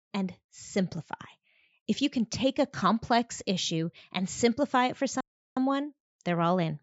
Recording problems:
high frequencies cut off; noticeable; nothing above 7.5 kHz
audio cutting out; at 5 s

